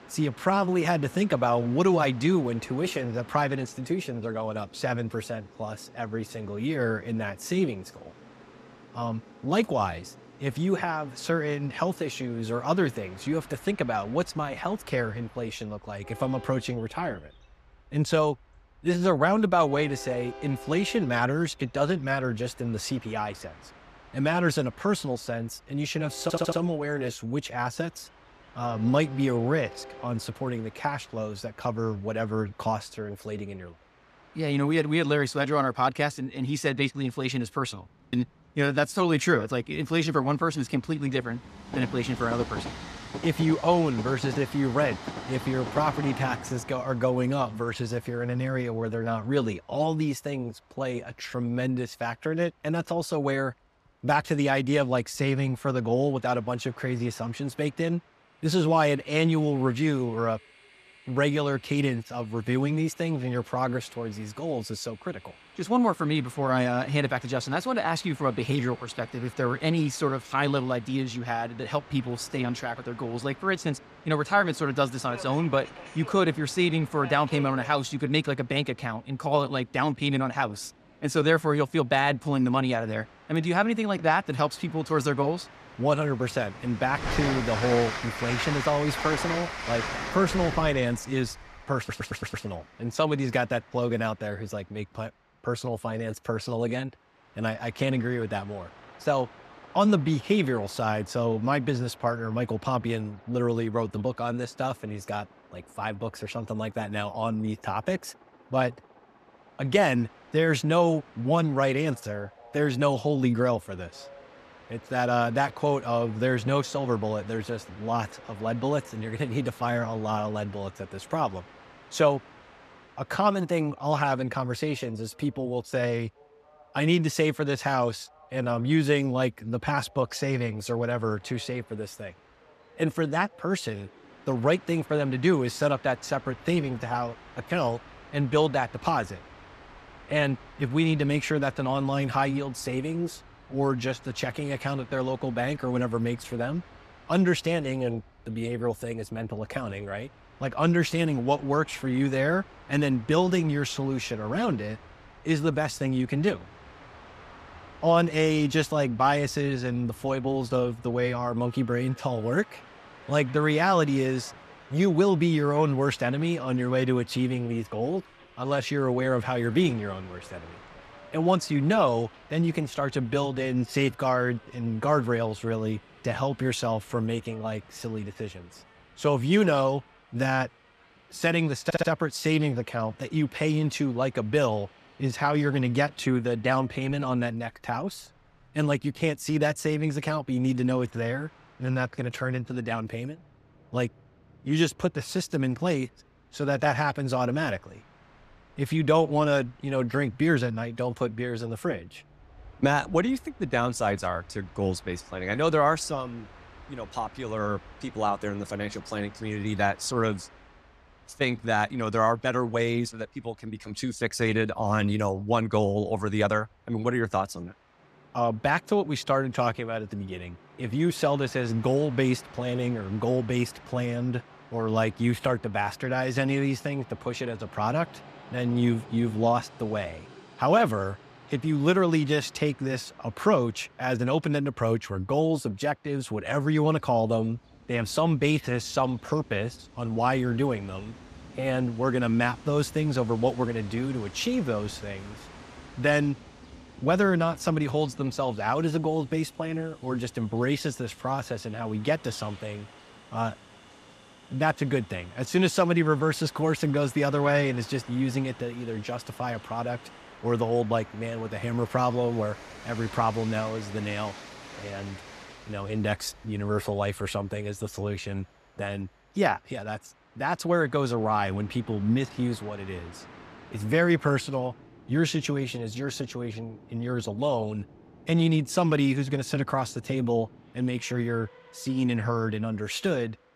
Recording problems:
train or aircraft noise; noticeable; throughout; 20 dB below the speech
audio stuttering; at 26 s, at 1:32 and at 3:02

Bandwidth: 14.5 kHz